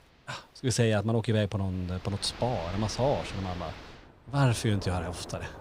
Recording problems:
rain or running water; noticeable; throughout; 15 dB below the speech

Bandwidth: 15.5 kHz